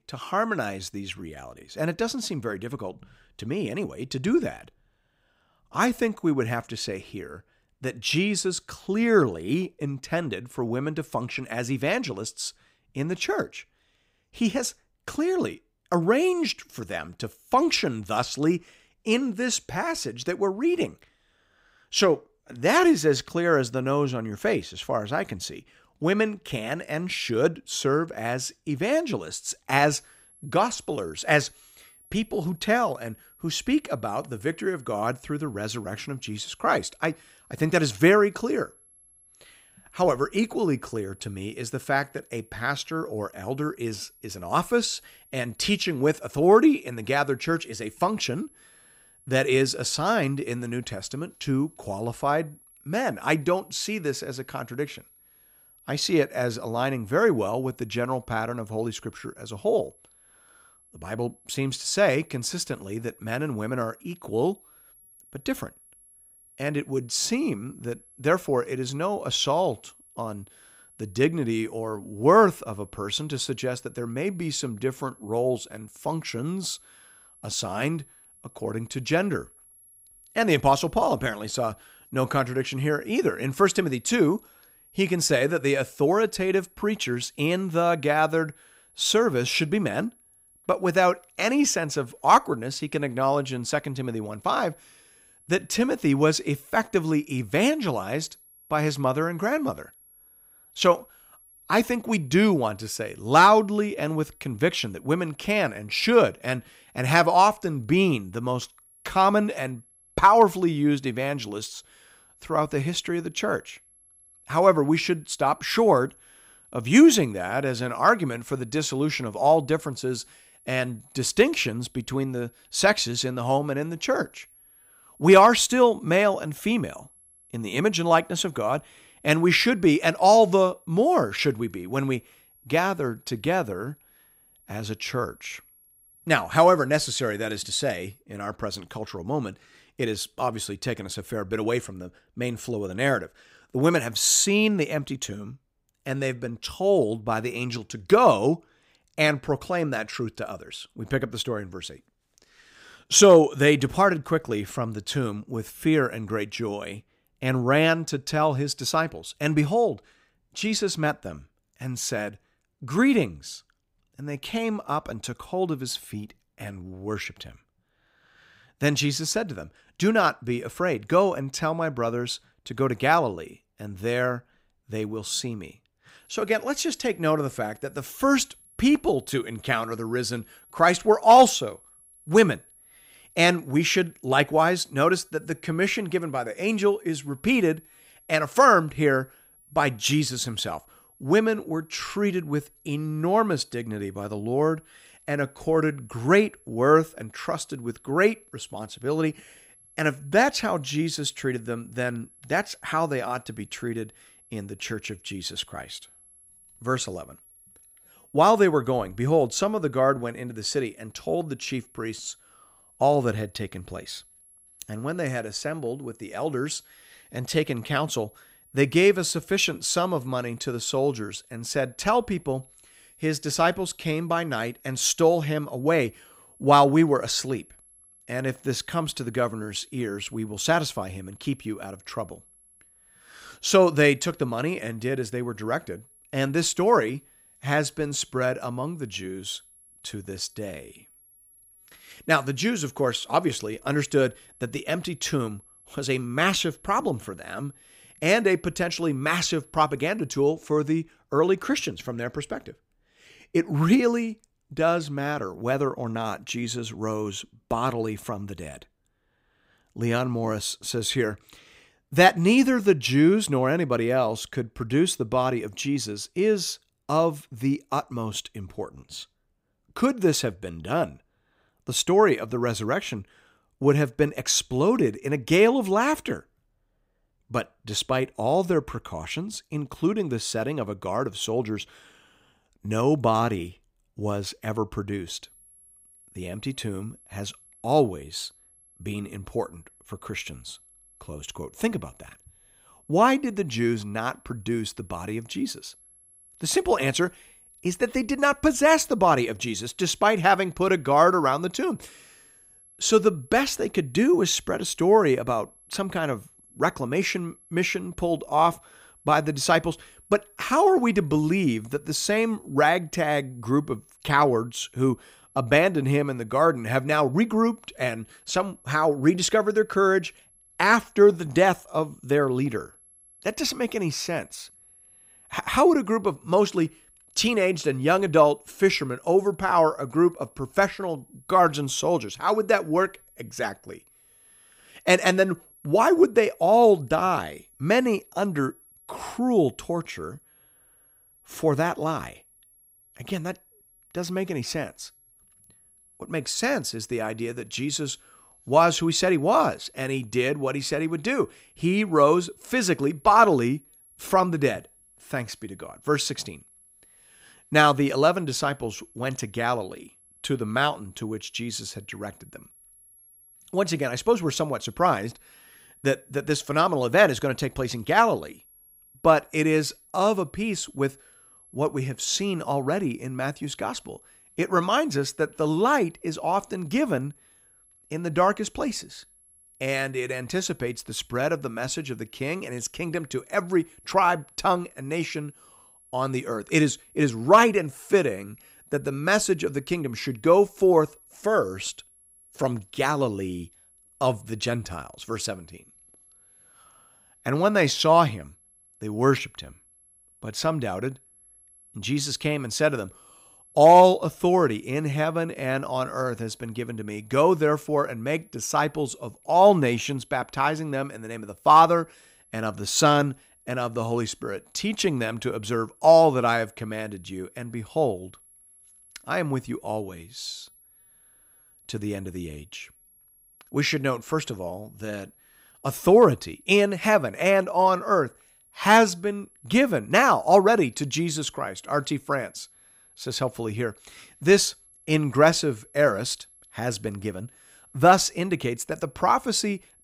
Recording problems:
high-pitched whine; faint; from 30 s to 2:18, from 2:56 to 4:10 and from 4:45 on; 11 kHz, 30 dB below the speech

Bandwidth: 15.5 kHz